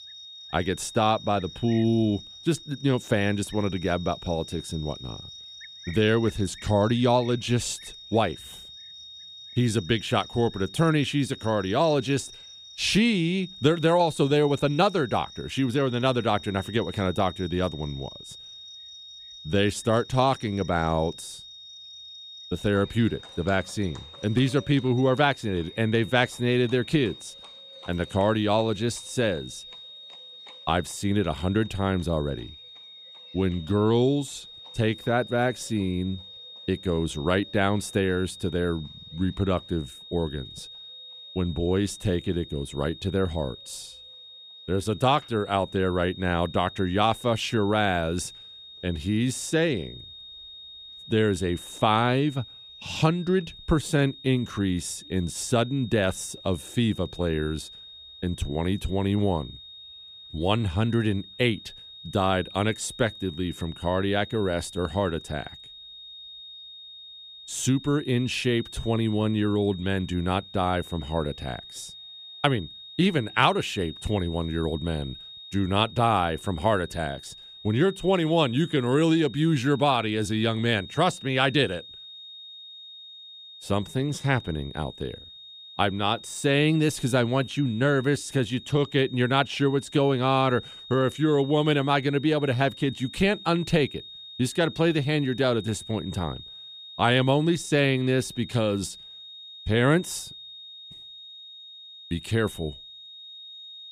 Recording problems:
high-pitched whine; noticeable; throughout; 3.5 kHz, 15 dB below the speech
animal sounds; faint; throughout; 30 dB below the speech

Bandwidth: 15 kHz